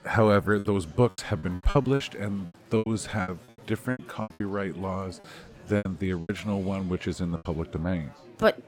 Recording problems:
murmuring crowd; faint; throughout; 20 dB below the speech
choppy; very; 12% of the speech affected

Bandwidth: 17 kHz